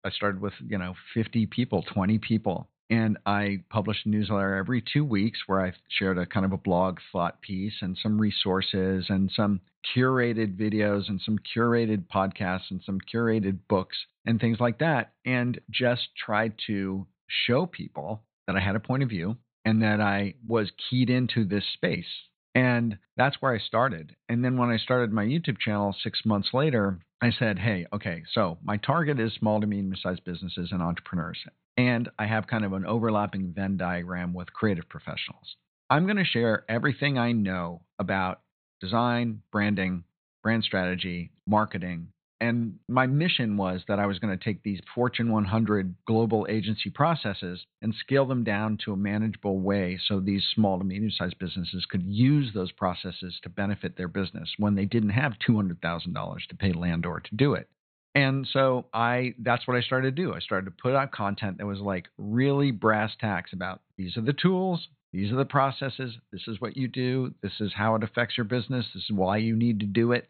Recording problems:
high frequencies cut off; severe; nothing above 4 kHz

